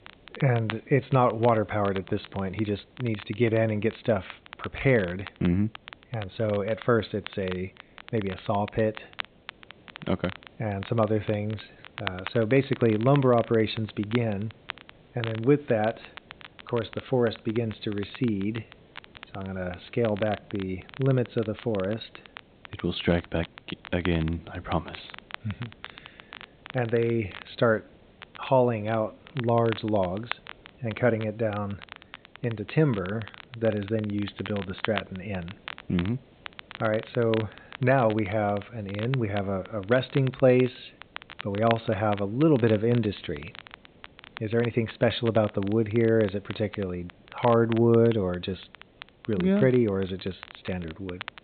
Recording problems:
high frequencies cut off; severe; nothing above 4 kHz
crackle, like an old record; noticeable; 15 dB below the speech
hiss; faint; throughout; 30 dB below the speech

